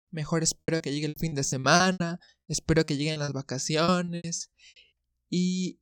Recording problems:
choppy; very; 17% of the speech affected

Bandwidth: 17.5 kHz